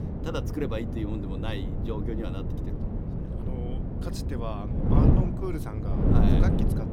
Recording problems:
wind noise on the microphone; heavy; 1 dB above the speech

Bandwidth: 16.5 kHz